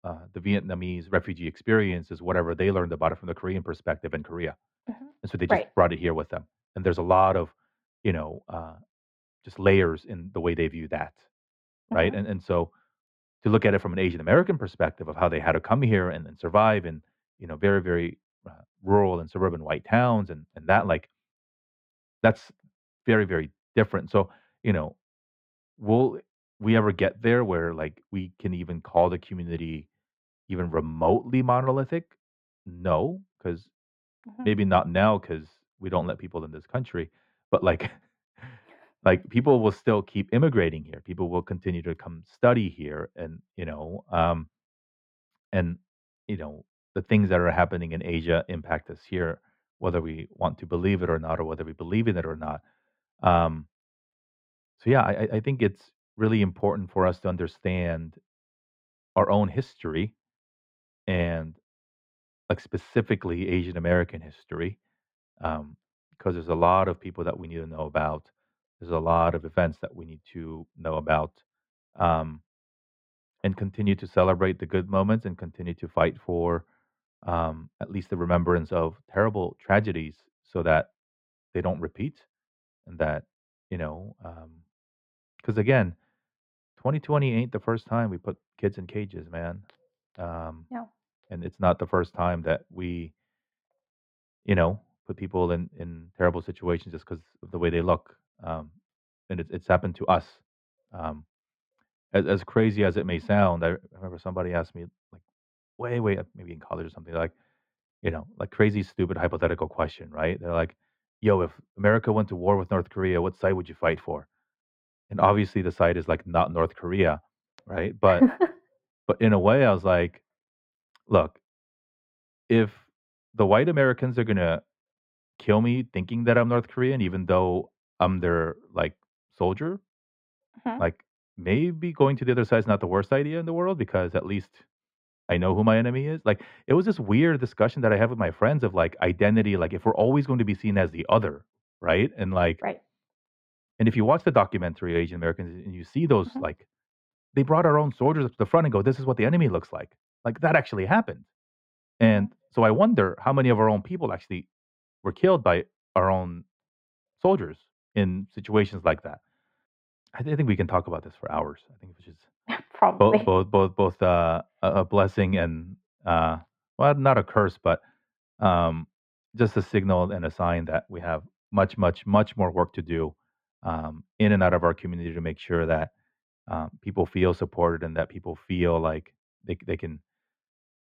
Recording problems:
muffled; very; fading above 2 kHz

